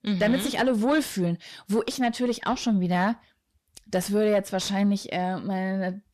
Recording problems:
distortion; slight; 10 dB below the speech

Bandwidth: 14 kHz